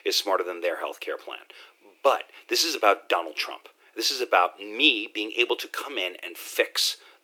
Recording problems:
thin; very; fading below 300 Hz

